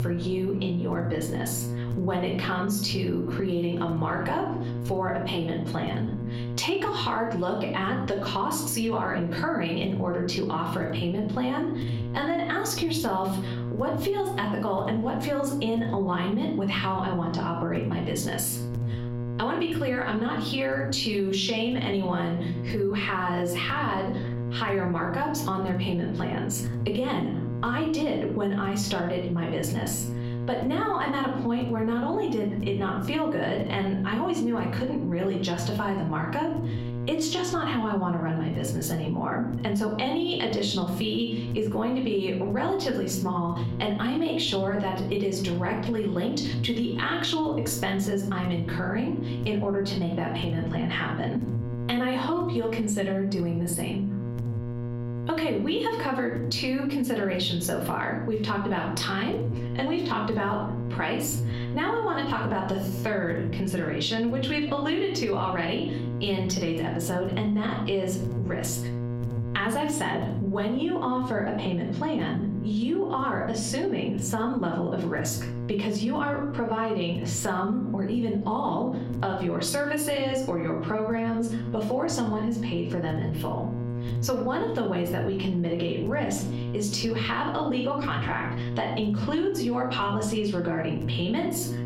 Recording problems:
room echo; slight; dies away in 0.5 s
off-mic speech; somewhat distant
squashed, flat; somewhat
electrical hum; noticeable; throughout; 60 Hz, 15 dB below the speech

